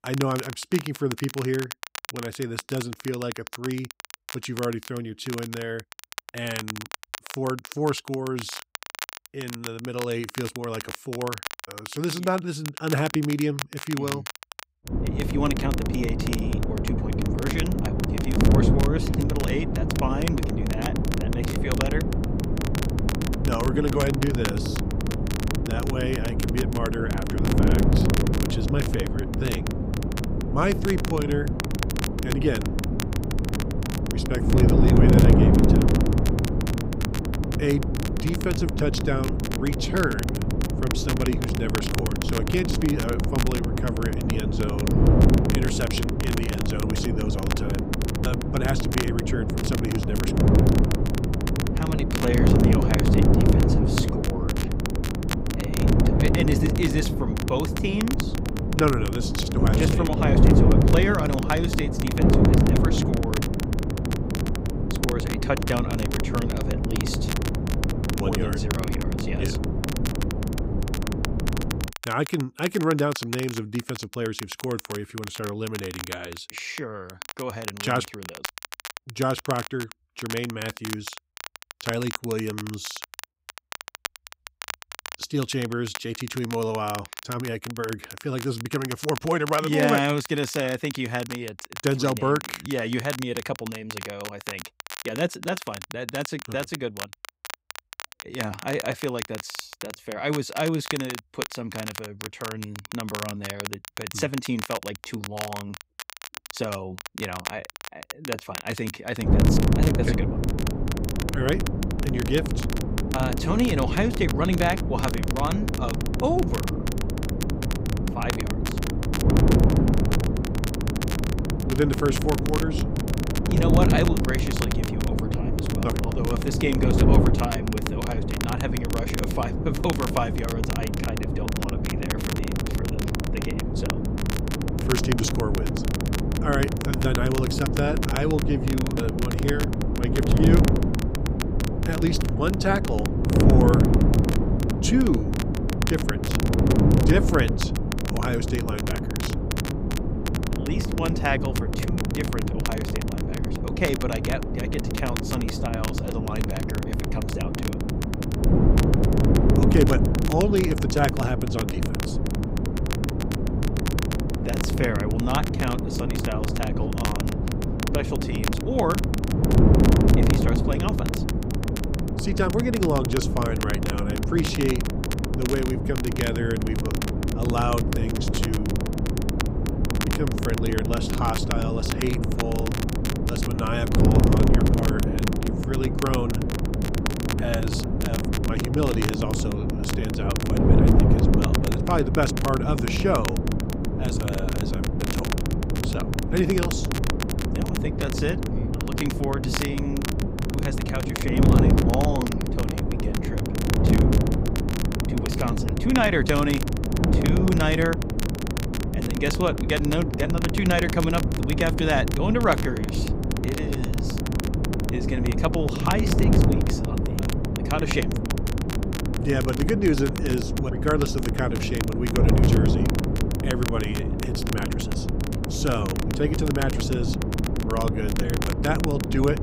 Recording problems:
wind noise on the microphone; heavy; from 15 s to 1:12 and from 1:49 on; 2 dB below the speech
crackle, like an old record; loud; 8 dB below the speech

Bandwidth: 15.5 kHz